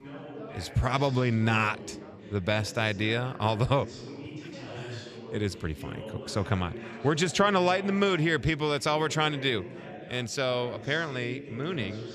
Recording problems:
background chatter; noticeable; throughout; 3 voices, 15 dB below the speech

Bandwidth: 14.5 kHz